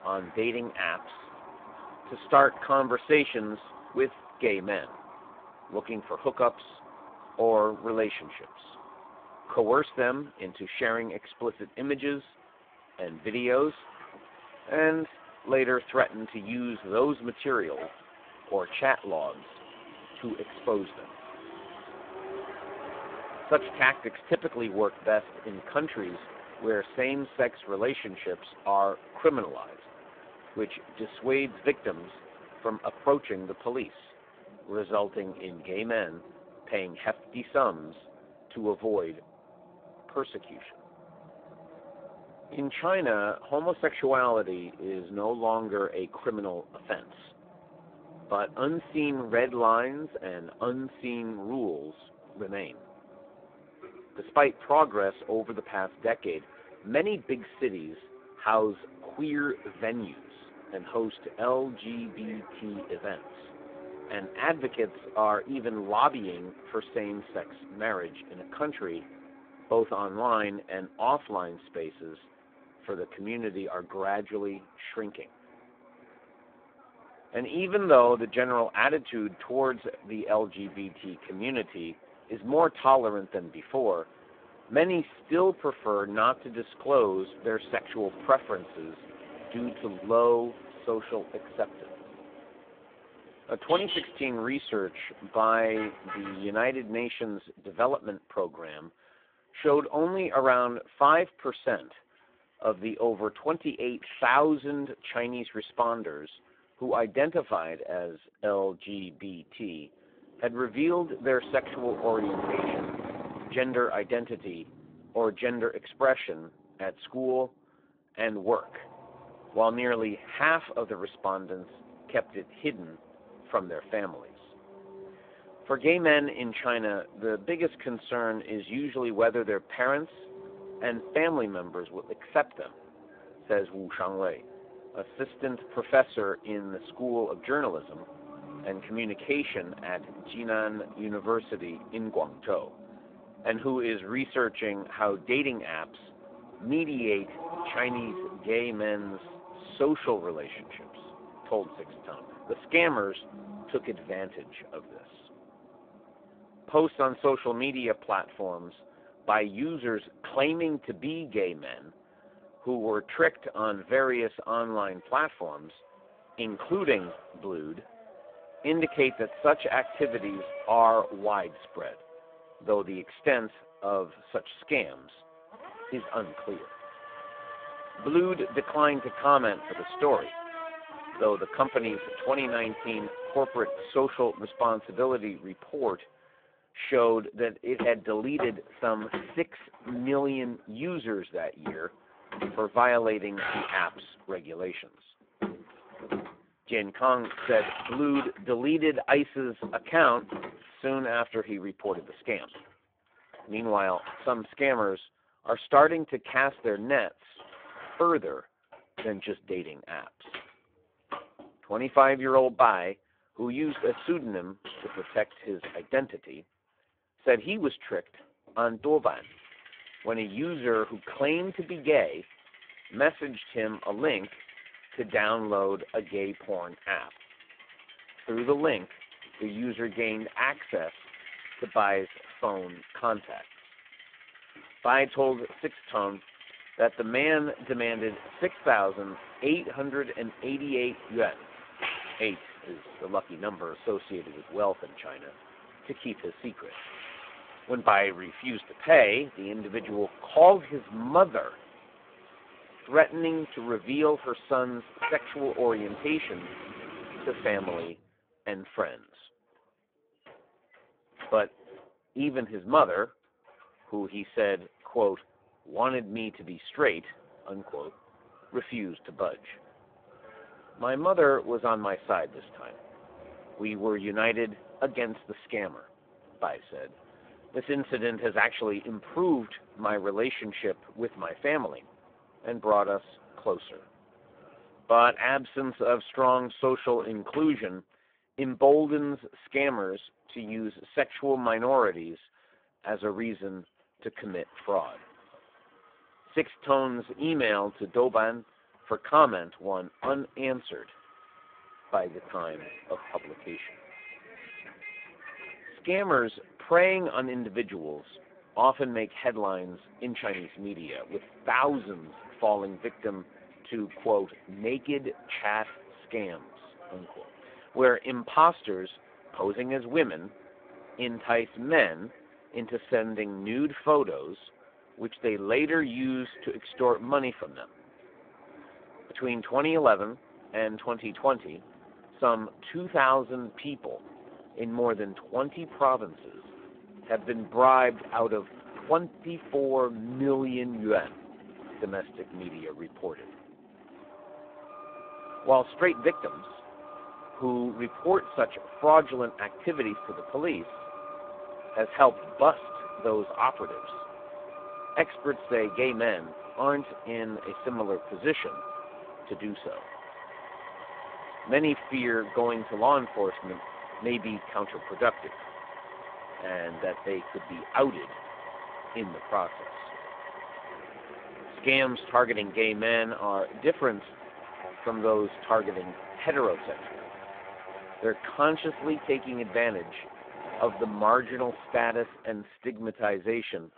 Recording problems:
phone-call audio; poor line
traffic noise; noticeable; throughout; 15 dB below the speech

